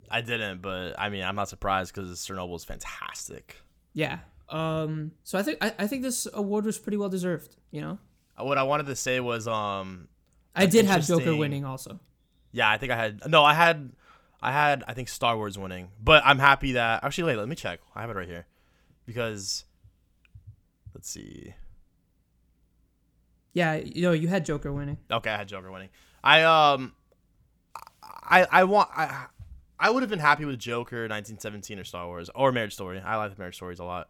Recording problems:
none

